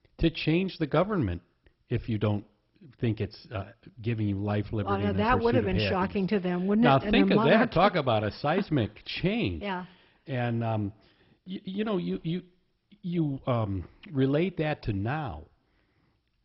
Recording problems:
garbled, watery; badly; nothing above 5.5 kHz

